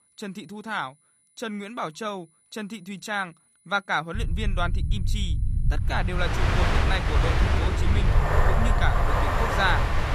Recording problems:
train or aircraft noise; very loud; from 6.5 s on; 4 dB above the speech
low rumble; noticeable; from 4 s on; 15 dB below the speech
high-pitched whine; faint; throughout; 10 kHz, 30 dB below the speech

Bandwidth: 14.5 kHz